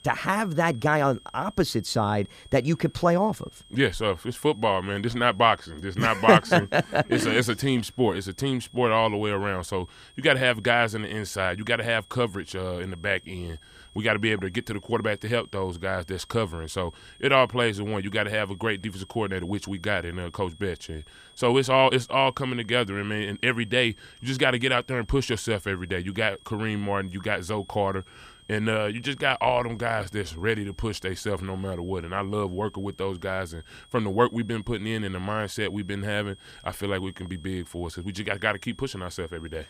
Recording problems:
high-pitched whine; faint; throughout; 3.5 kHz, 25 dB below the speech

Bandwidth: 15 kHz